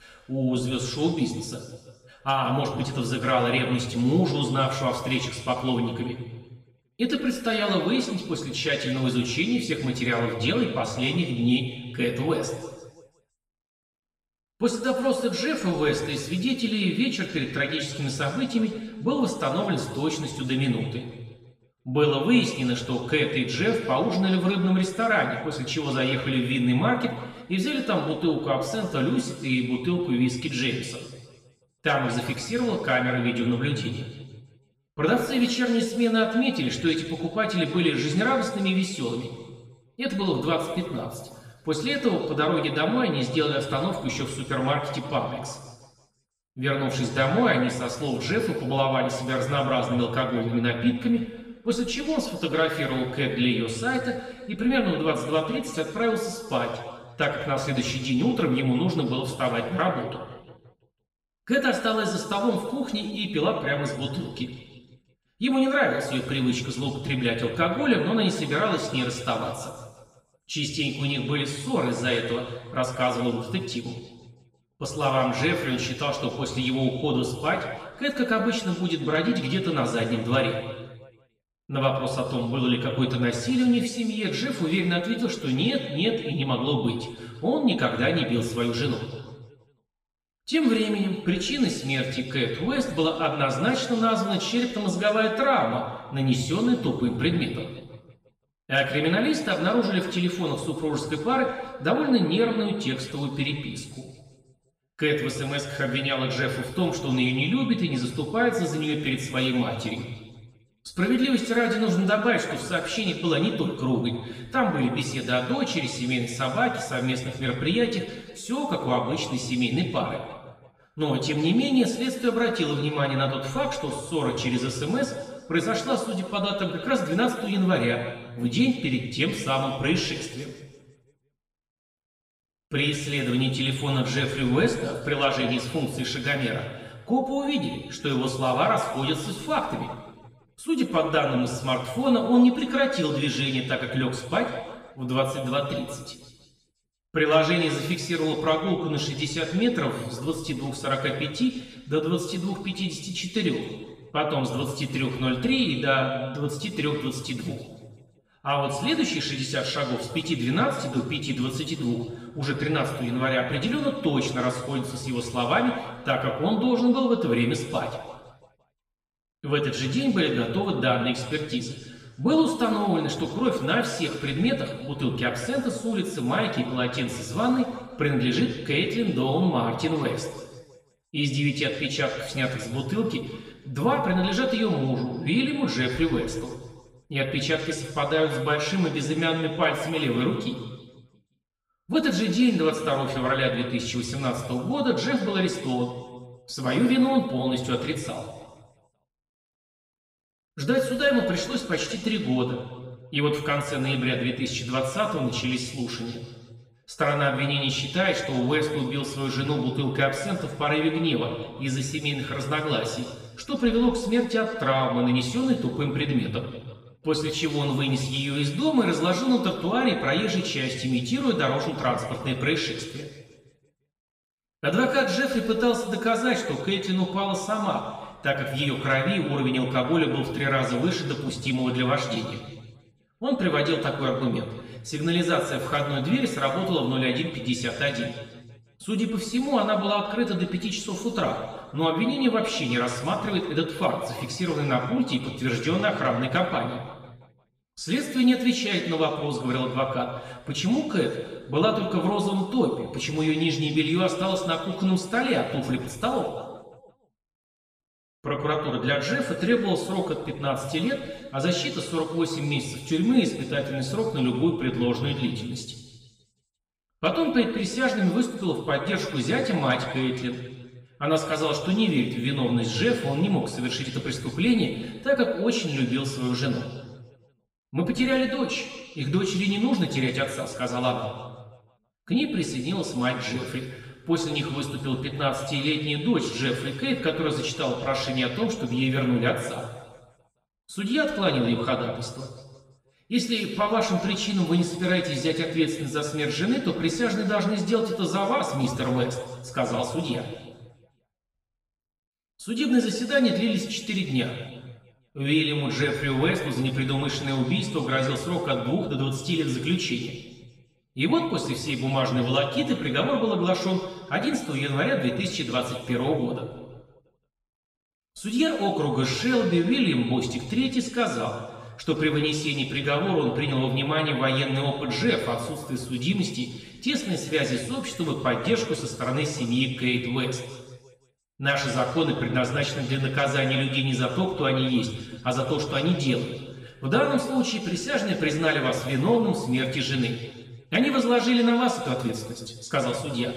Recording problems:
off-mic speech; far
room echo; noticeable; dies away in 1.3 s

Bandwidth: 15 kHz